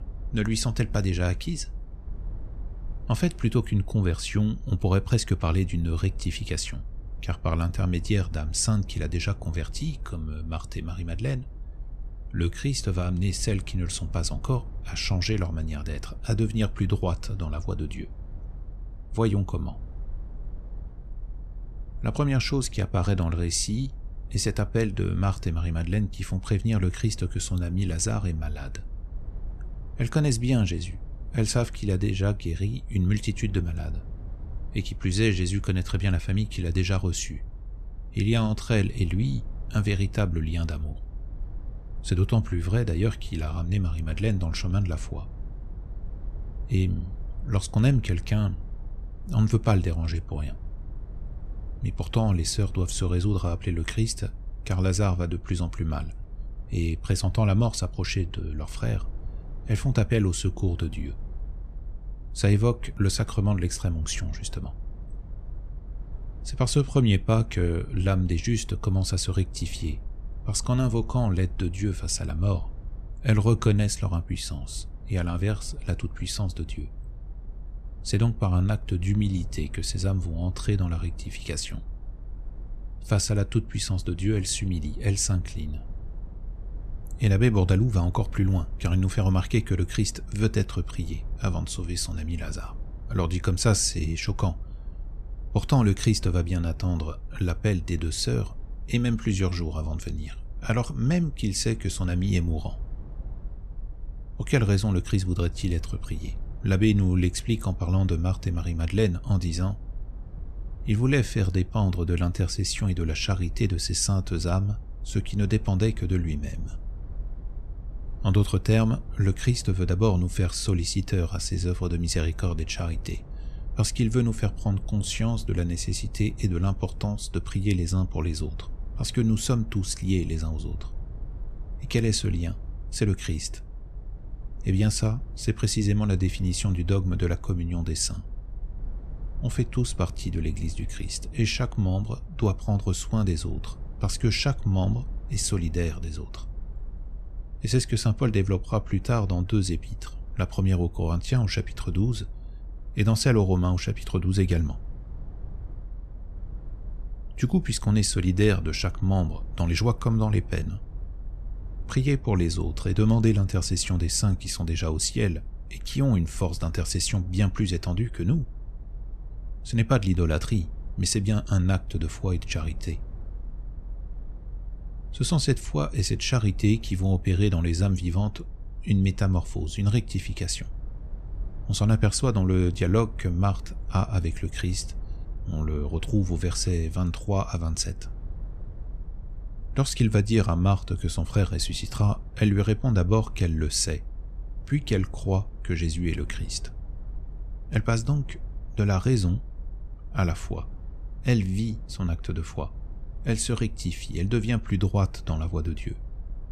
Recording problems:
low rumble; faint; throughout; 25 dB below the speech

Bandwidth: 14 kHz